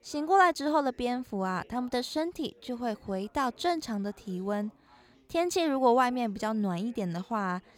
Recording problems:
background chatter; faint; throughout; 4 voices, 30 dB below the speech

